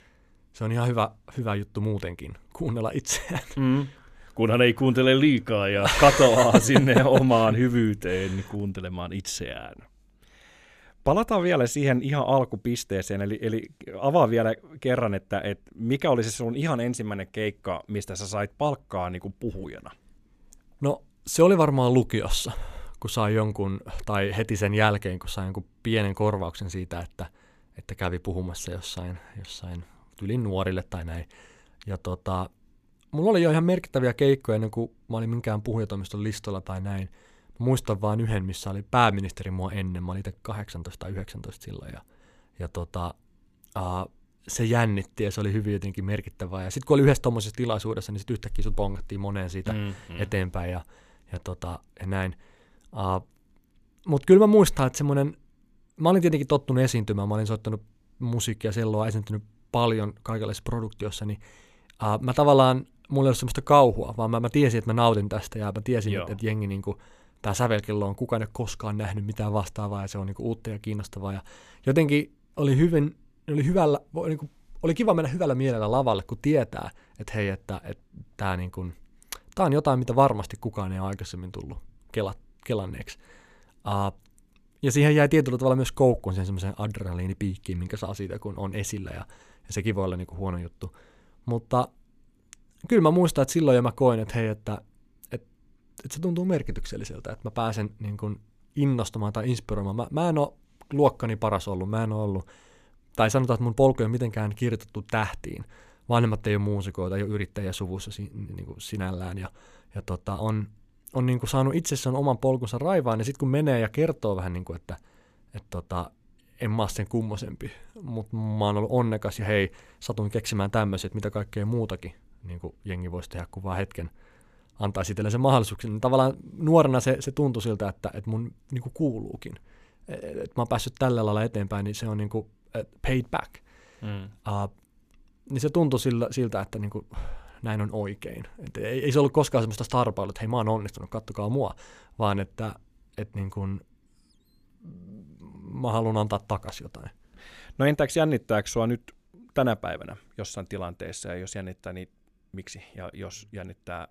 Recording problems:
none

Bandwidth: 14.5 kHz